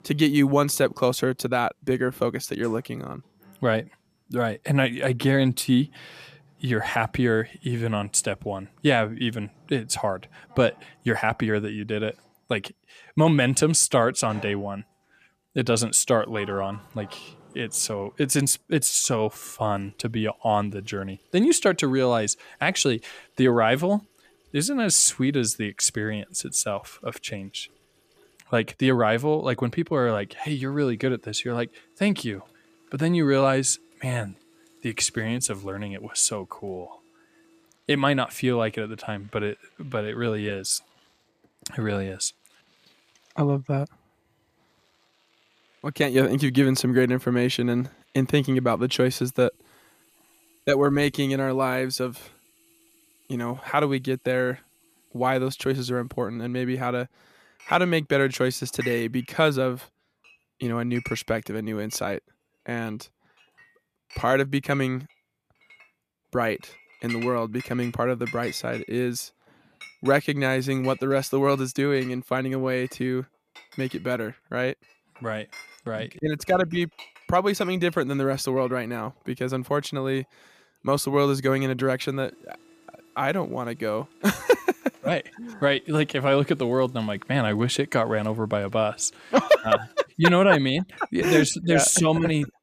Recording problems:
household noises; faint; throughout; 25 dB below the speech

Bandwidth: 14.5 kHz